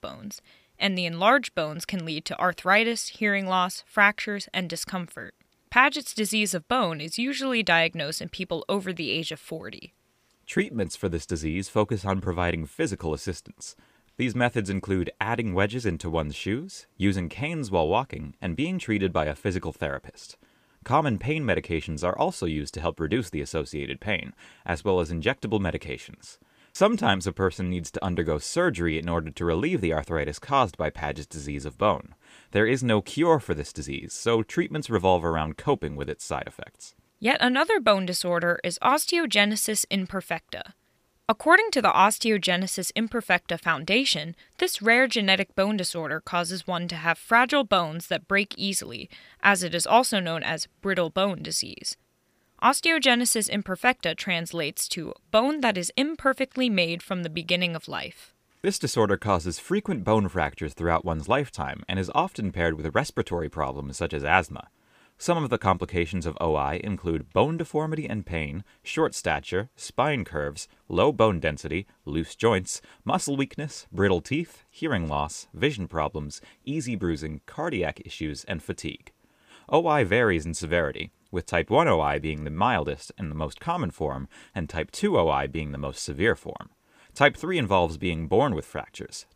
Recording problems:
none

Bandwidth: 15 kHz